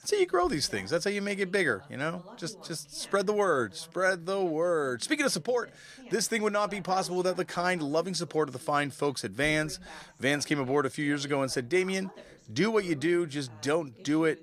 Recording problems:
voice in the background; faint; throughout; 25 dB below the speech

